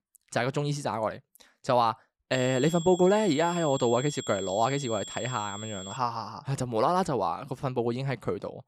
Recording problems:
high-pitched whine; noticeable; from 2.5 to 6 s; 3.5 kHz, 10 dB below the speech

